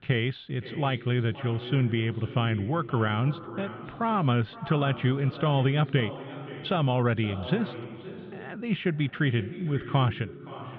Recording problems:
echo of what is said; noticeable; throughout; 520 ms later, 15 dB below the speech
muffled; slightly; fading above 3.5 kHz

